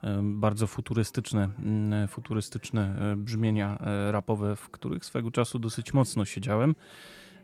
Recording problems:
background chatter; faint; throughout; 4 voices, 30 dB below the speech

